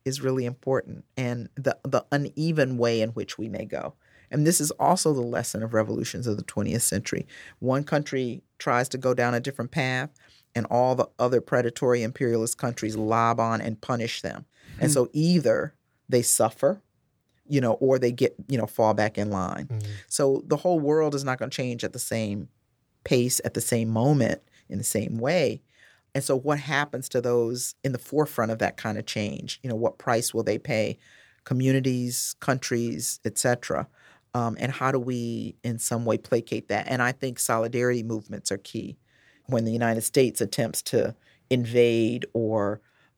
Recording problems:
none

